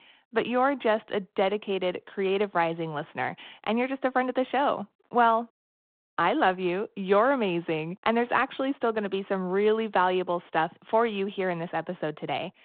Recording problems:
phone-call audio

